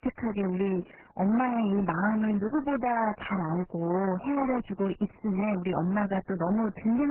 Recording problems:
garbled, watery; badly; nothing above 3 kHz
distortion; slight; 14% of the sound clipped
abrupt cut into speech; at the end

